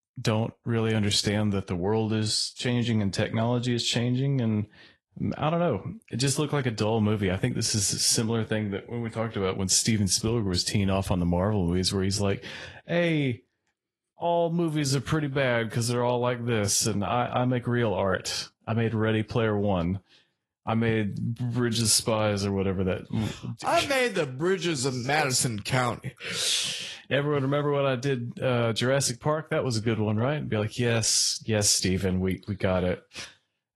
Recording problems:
garbled, watery; slightly; nothing above 11.5 kHz

